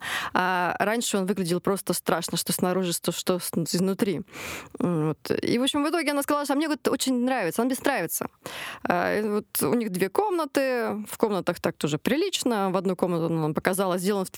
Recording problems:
squashed, flat; somewhat

